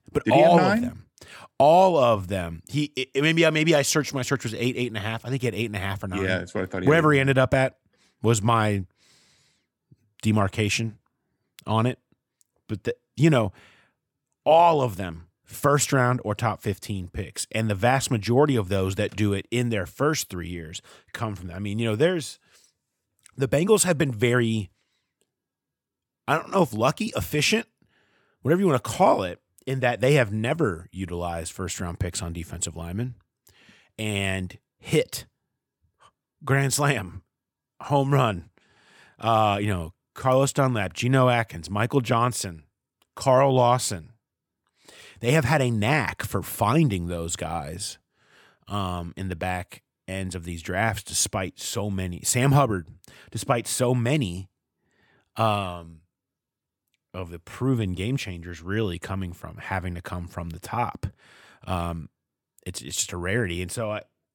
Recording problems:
none

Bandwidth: 17.5 kHz